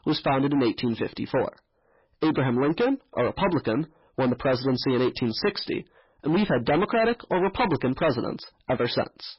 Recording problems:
distortion; heavy; 15% of the sound clipped
garbled, watery; badly; nothing above 5.5 kHz

